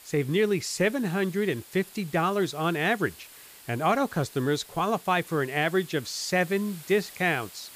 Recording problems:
hiss; noticeable; throughout; 20 dB below the speech

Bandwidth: 15 kHz